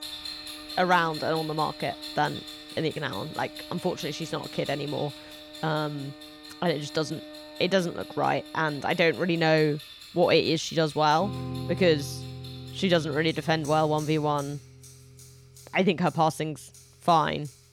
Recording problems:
household noises; noticeable; throughout; 15 dB below the speech
background music; noticeable; throughout; 15 dB below the speech

